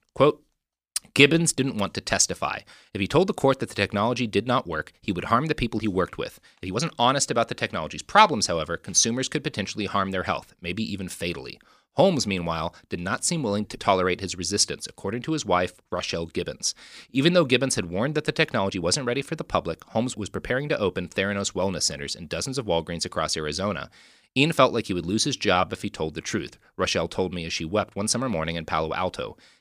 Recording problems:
uneven, jittery; slightly; from 1 to 28 s

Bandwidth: 15 kHz